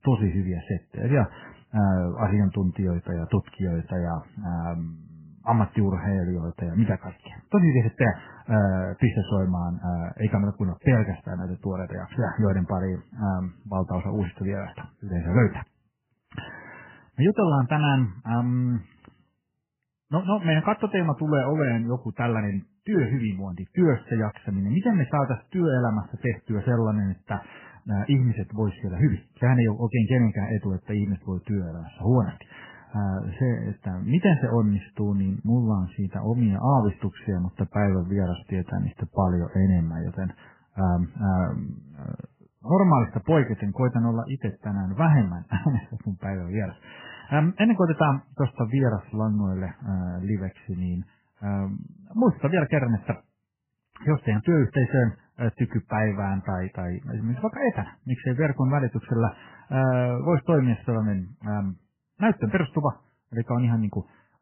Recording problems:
garbled, watery; badly; nothing above 3 kHz

